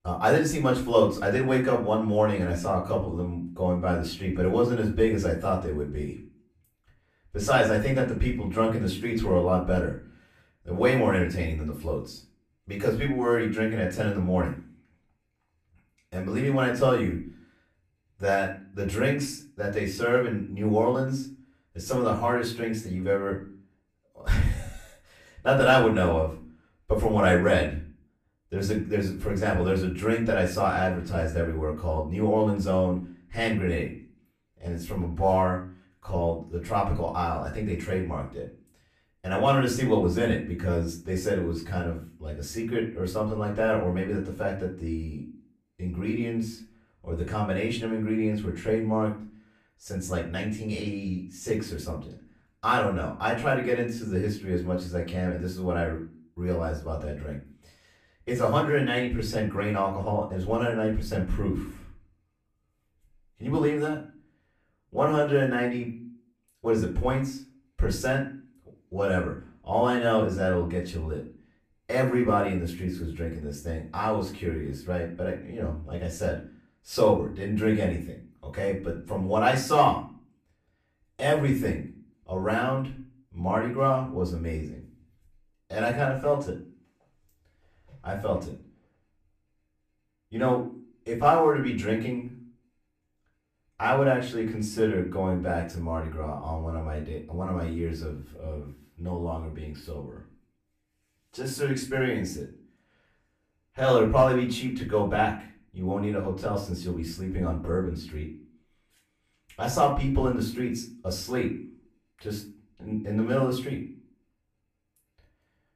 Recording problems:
off-mic speech; far
room echo; slight; dies away in 0.4 s

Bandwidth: 14.5 kHz